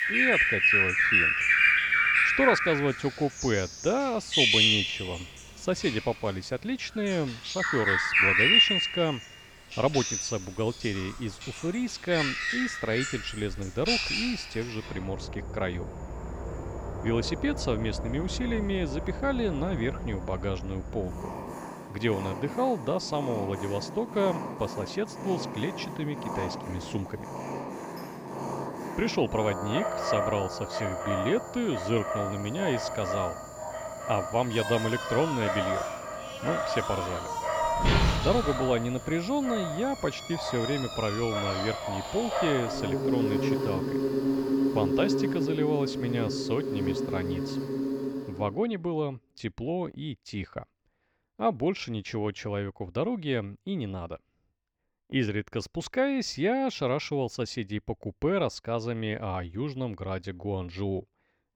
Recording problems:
animal sounds; very loud; until 48 s; 3 dB above the speech

